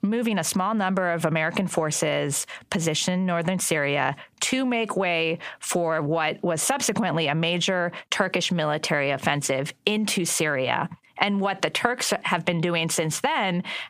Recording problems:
squashed, flat; heavily

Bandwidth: 15 kHz